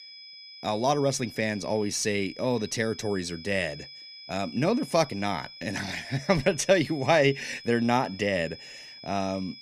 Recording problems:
high-pitched whine; noticeable; throughout; 5 kHz, 15 dB below the speech

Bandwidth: 14.5 kHz